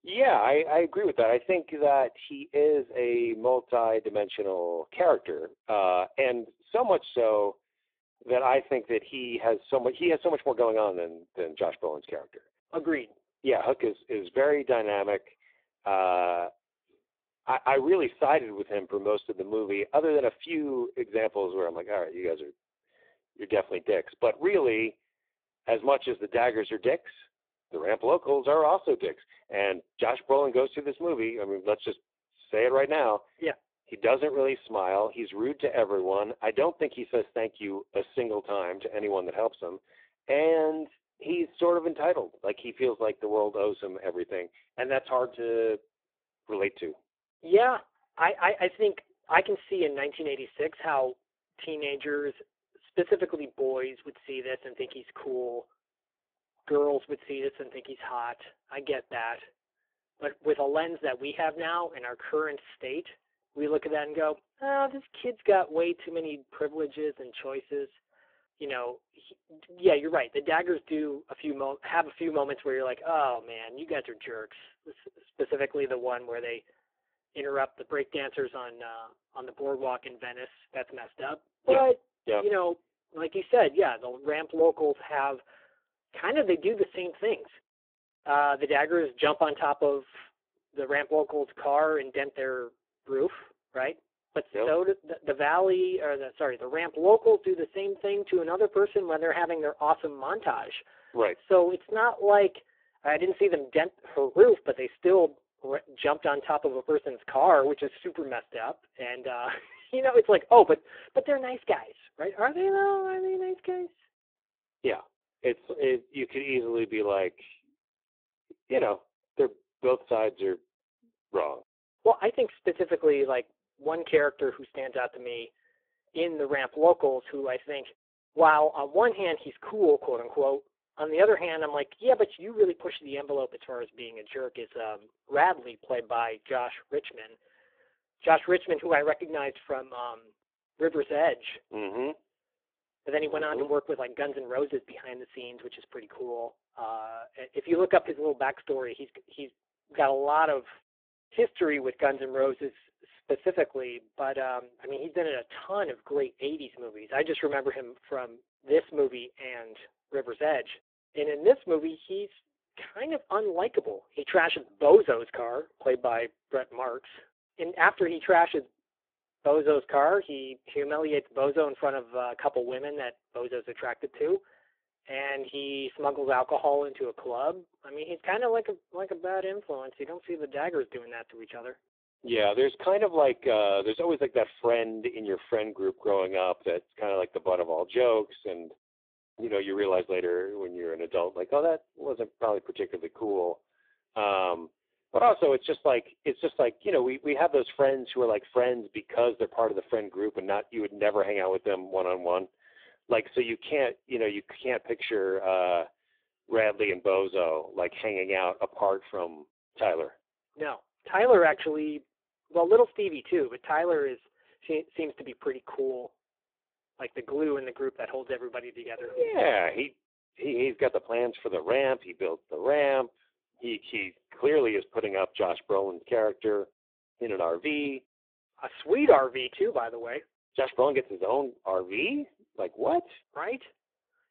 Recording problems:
phone-call audio; poor line

